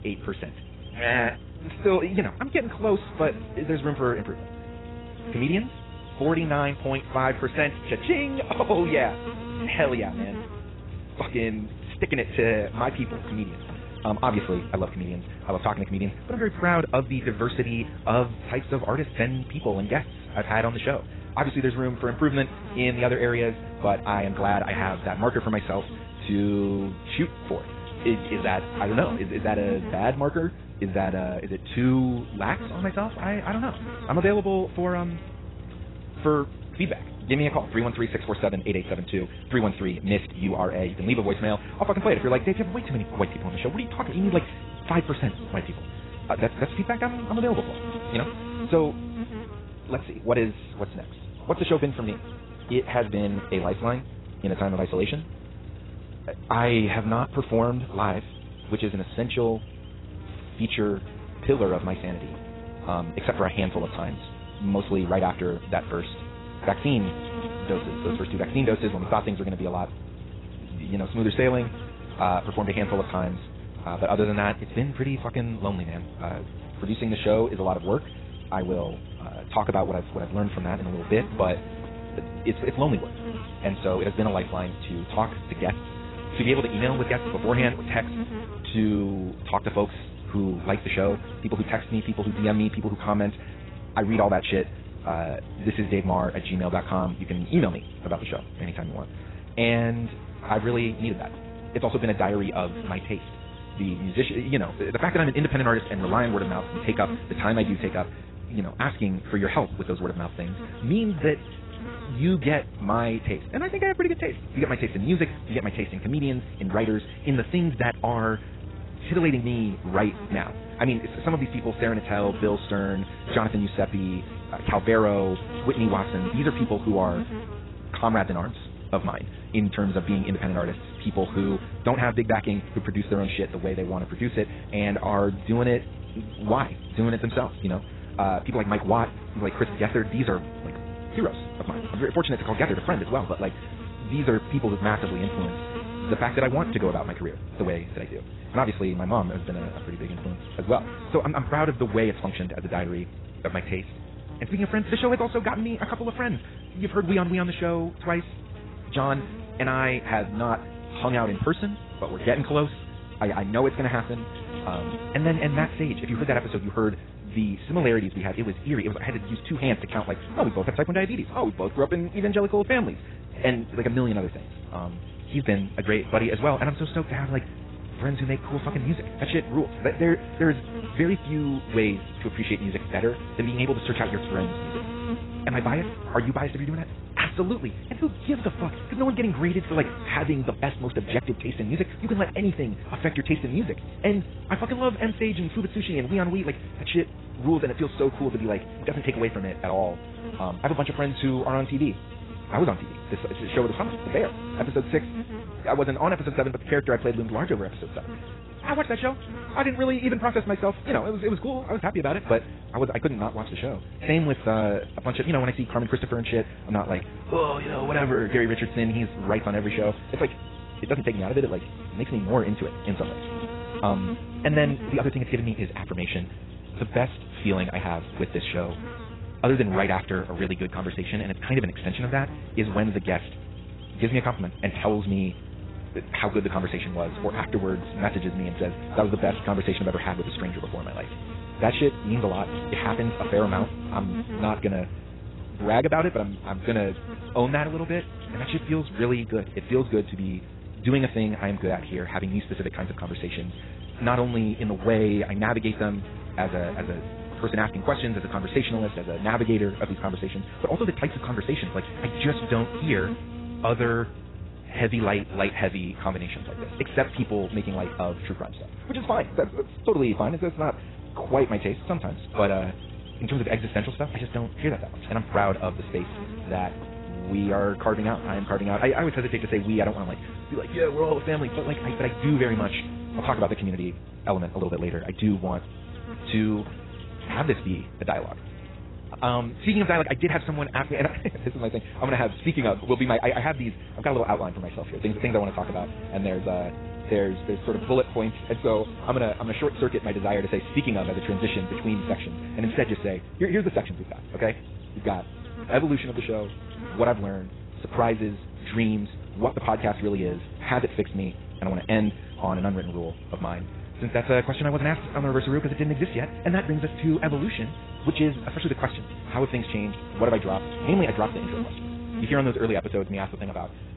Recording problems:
garbled, watery; badly; nothing above 4 kHz
wrong speed, natural pitch; too fast; 1.6 times normal speed
electrical hum; noticeable; throughout; 60 Hz, 15 dB below the speech

